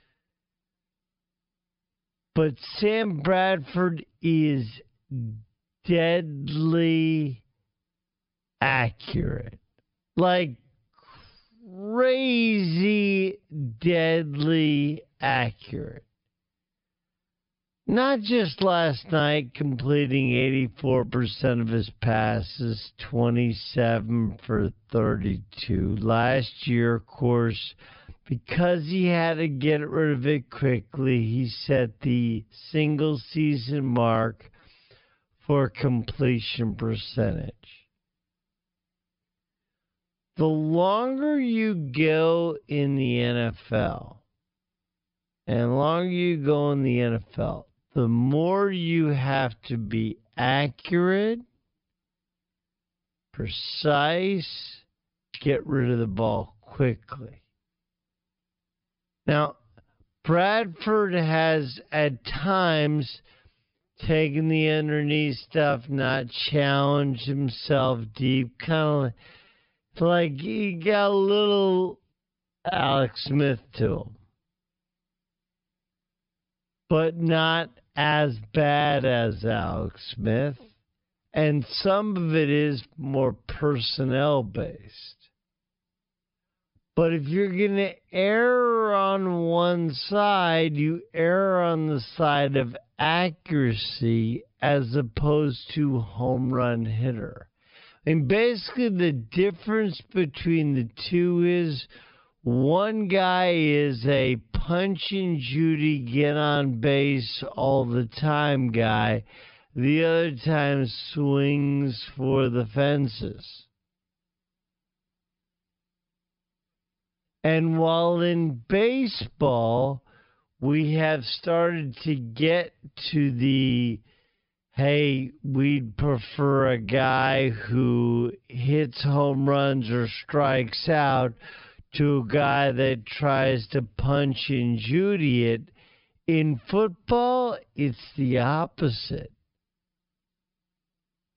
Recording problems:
wrong speed, natural pitch; too slow; 0.5 times normal speed
high frequencies cut off; noticeable; nothing above 5.5 kHz

